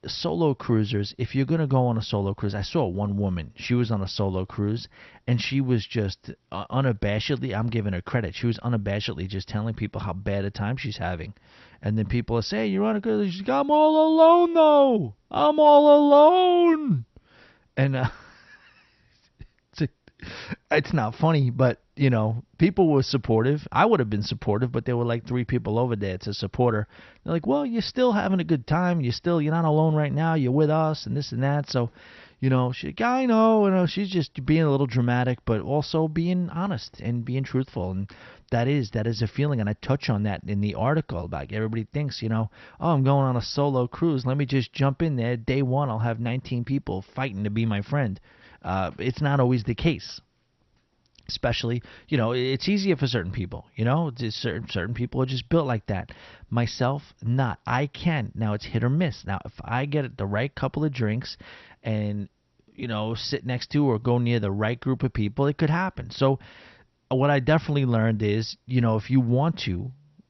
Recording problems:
garbled, watery; slightly; nothing above 6 kHz

